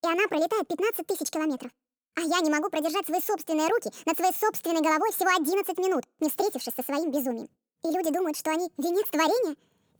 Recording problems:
wrong speed and pitch; too fast and too high; 1.6 times normal speed

